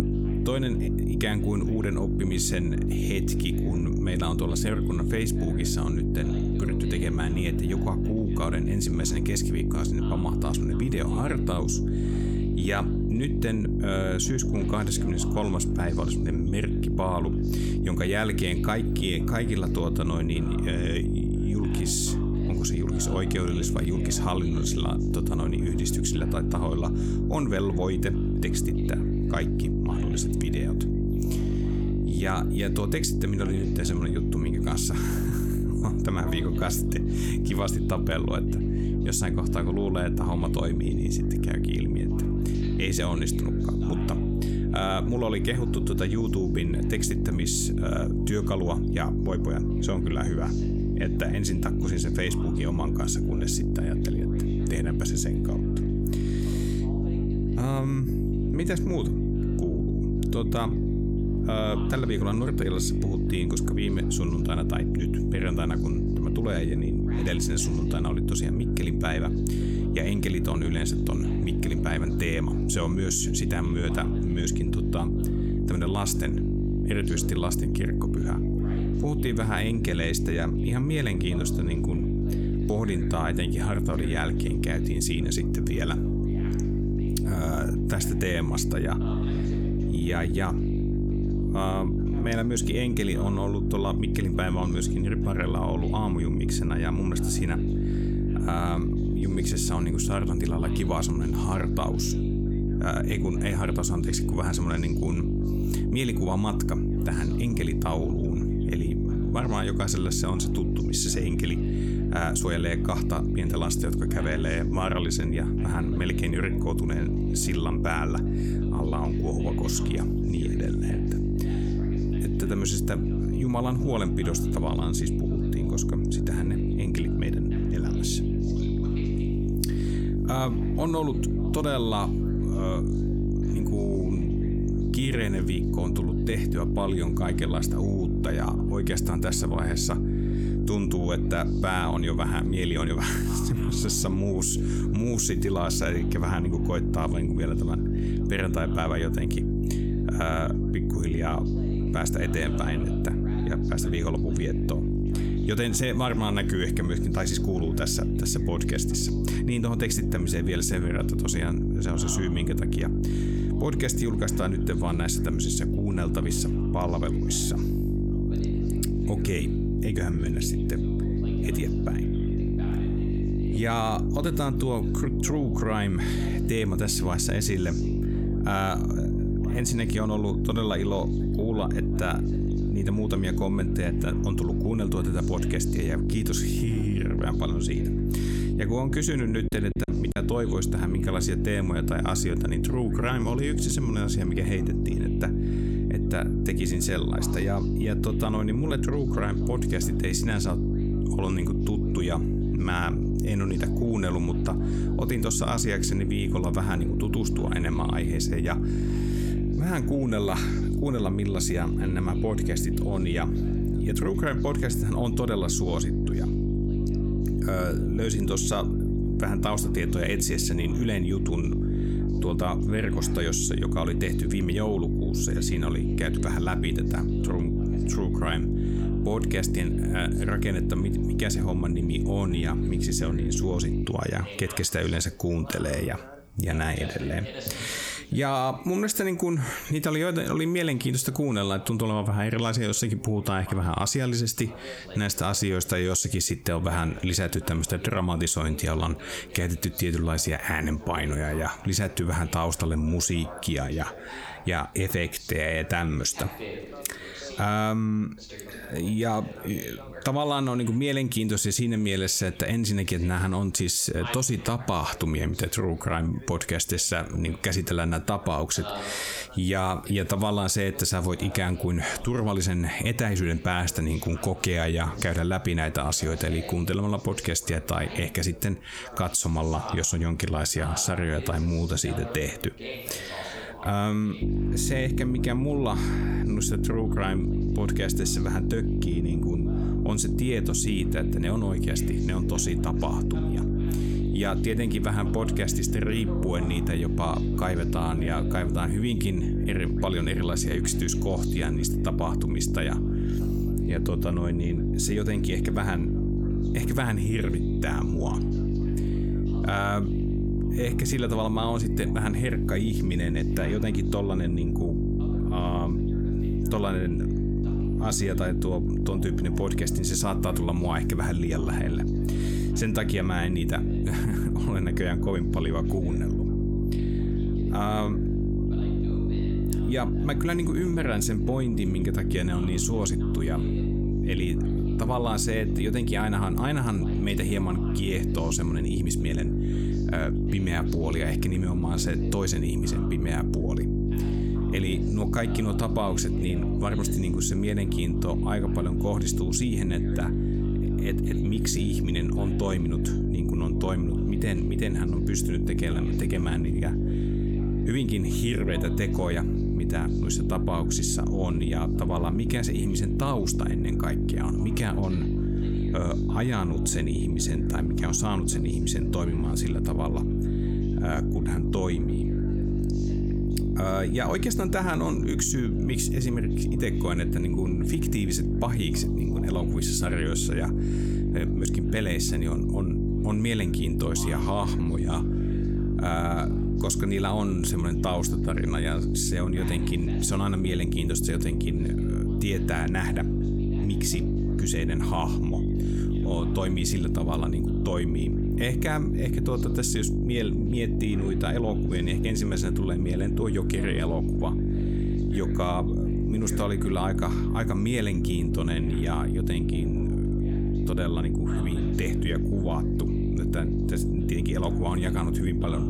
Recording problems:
squashed, flat; somewhat
electrical hum; loud; until 3:54 and from 4:44 on; 50 Hz, 3 dB below the speech
background chatter; faint; throughout; 2 voices, 20 dB below the speech
choppy; very; at 3:10; 9% of the speech affected

